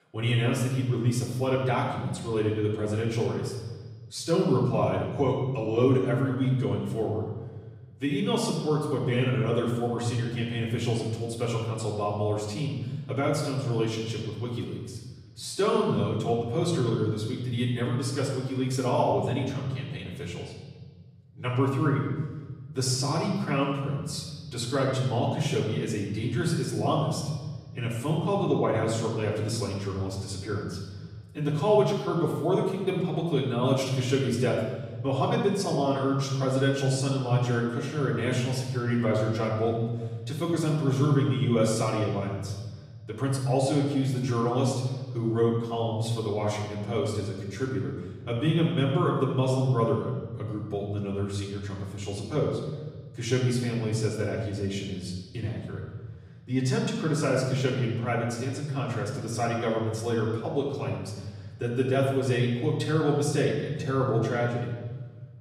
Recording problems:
off-mic speech; far
room echo; noticeable; dies away in 1.7 s

